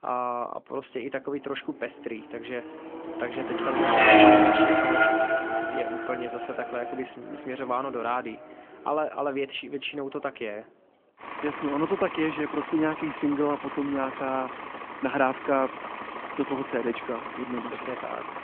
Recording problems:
phone-call audio; nothing above 3.5 kHz
traffic noise; very loud; throughout; 5 dB above the speech

